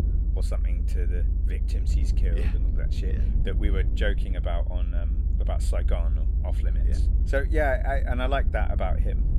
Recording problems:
low rumble; noticeable; throughout; 15 dB below the speech

